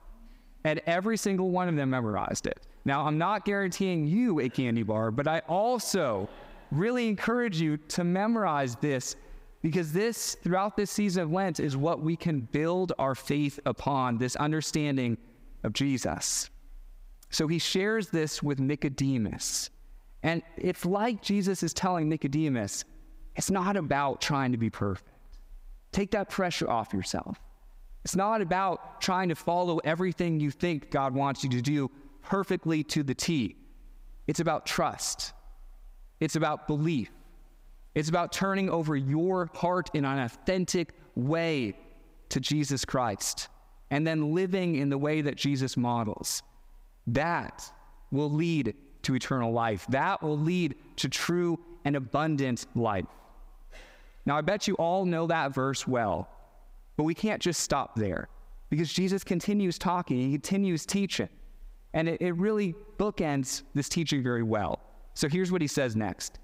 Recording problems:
squashed, flat; heavily

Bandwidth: 15.5 kHz